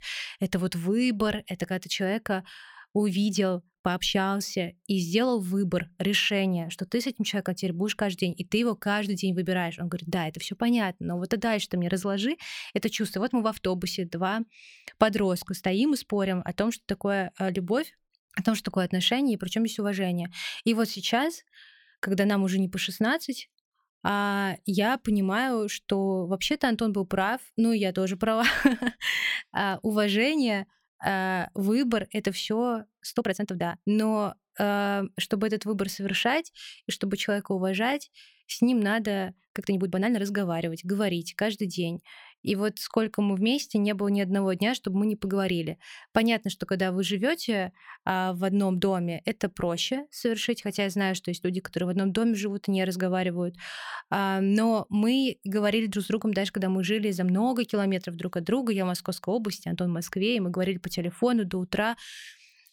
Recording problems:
uneven, jittery; strongly; from 3 to 40 s

